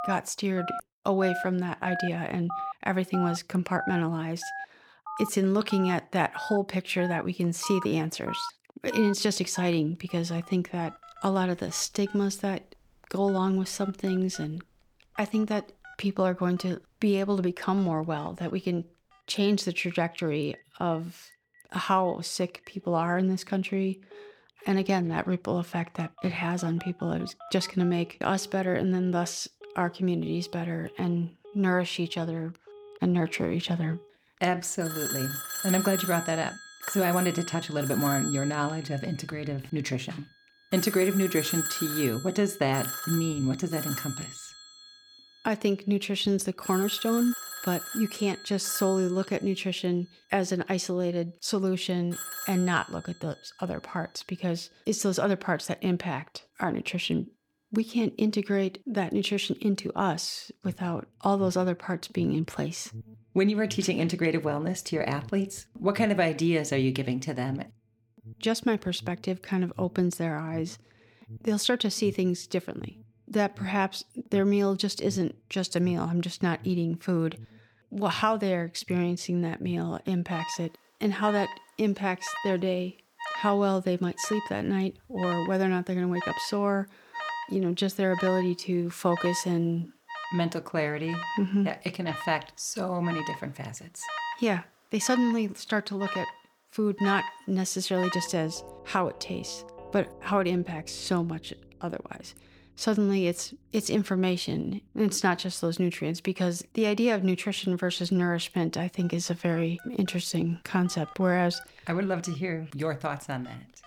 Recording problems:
alarms or sirens; loud; throughout; 10 dB below the speech

